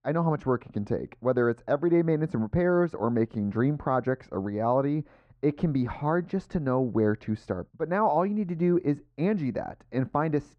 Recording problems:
muffled; very; fading above 2 kHz

